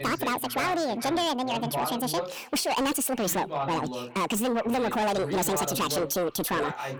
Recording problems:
distortion; heavy; 7 dB below the speech
wrong speed and pitch; too fast and too high; 1.6 times normal speed
echo of what is said; faint; throughout; 410 ms later, 25 dB below the speech
voice in the background; loud; throughout; 7 dB below the speech

